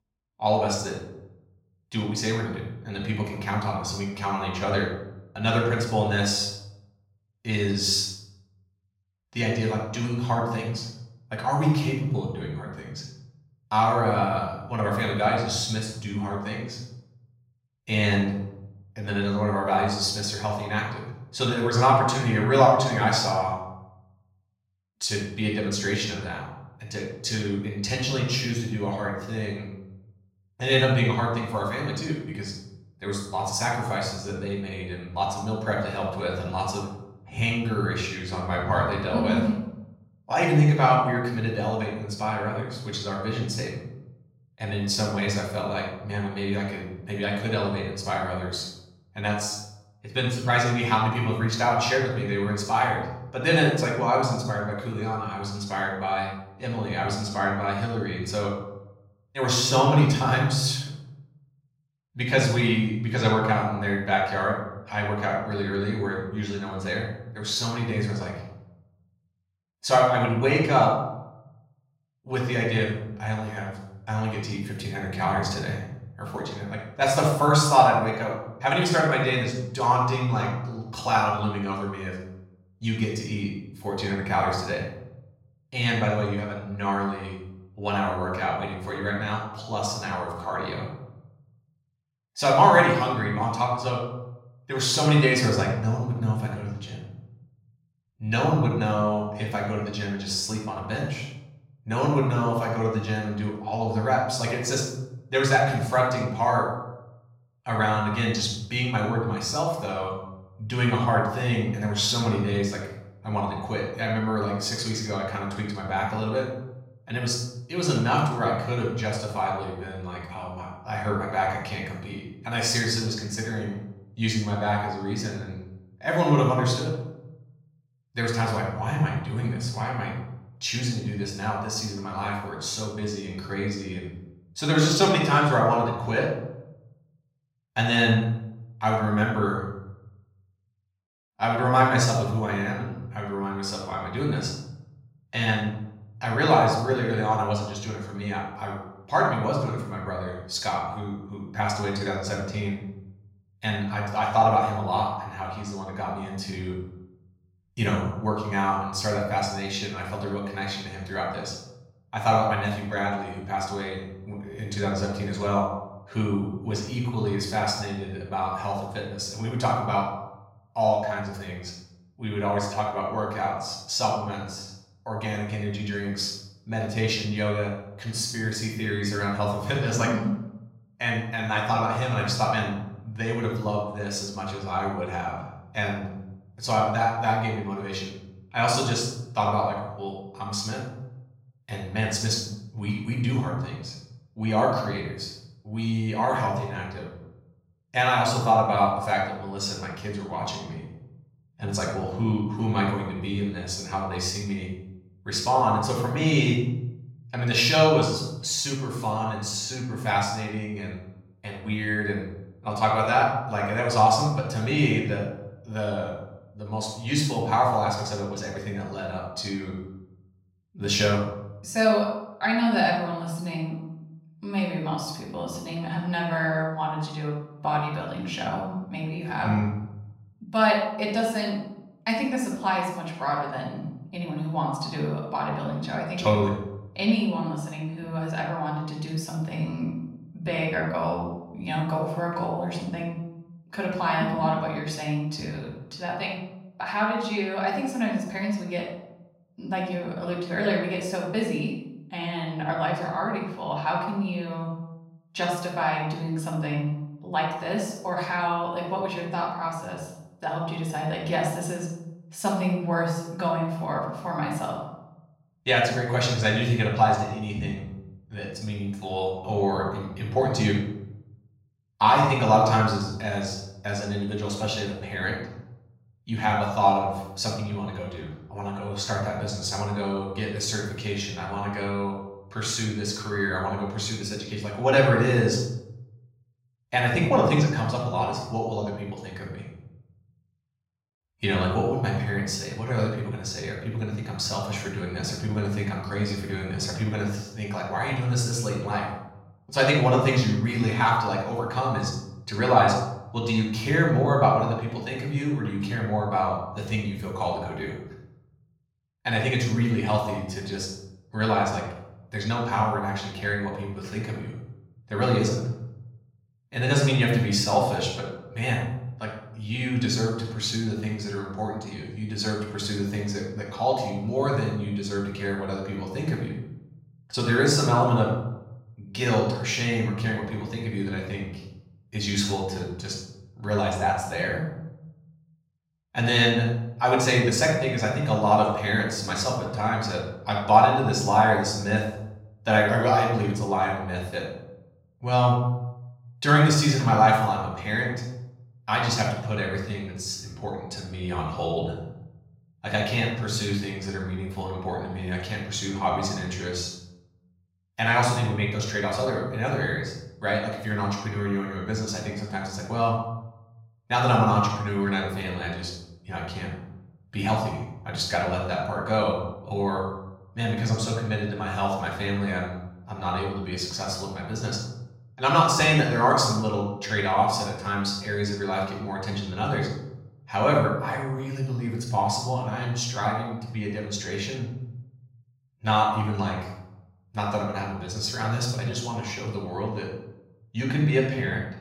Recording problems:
off-mic speech; far
room echo; noticeable; dies away in 0.8 s

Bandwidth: 16.5 kHz